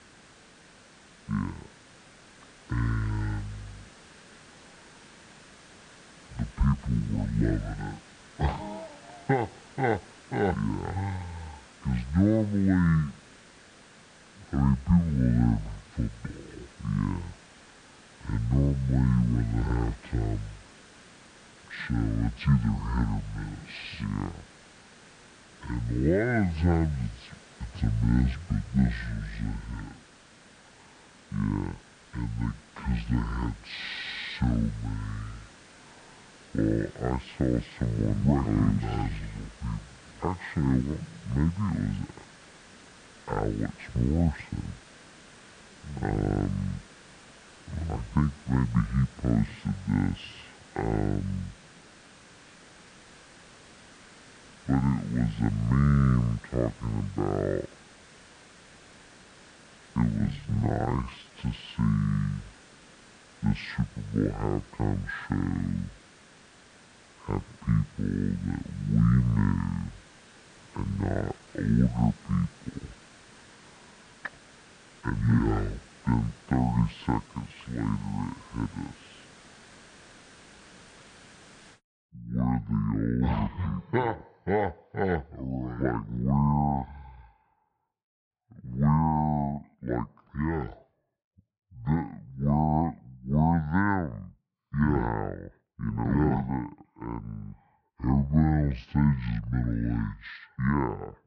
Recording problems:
wrong speed and pitch; too slow and too low; 0.6 times normal speed
muffled; slightly; fading above 3 kHz
hiss; faint; until 1:22; 20 dB below the speech
uneven, jittery; strongly; from 6.5 s to 1:37

